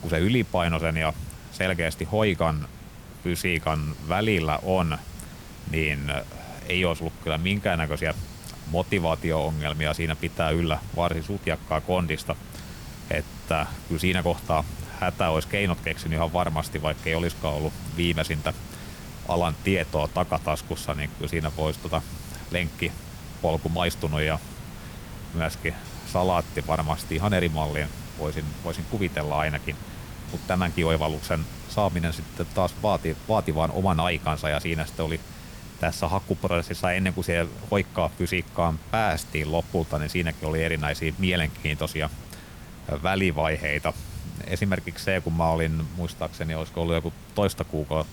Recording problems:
hiss; noticeable; throughout; 15 dB below the speech

